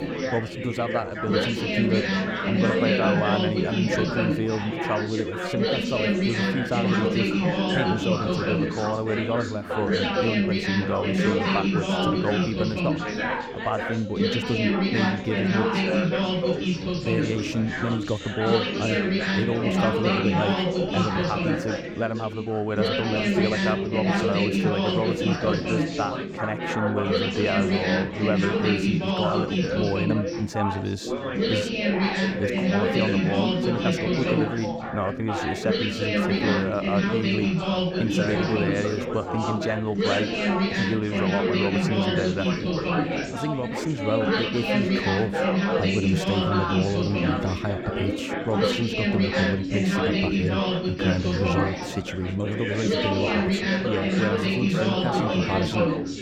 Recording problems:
chatter from many people; very loud; throughout; 4 dB above the speech

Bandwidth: 18.5 kHz